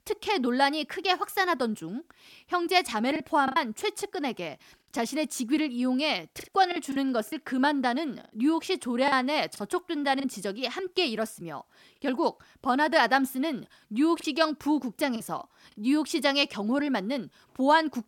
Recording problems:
choppy; occasionally; 3% of the speech affected

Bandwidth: 17.5 kHz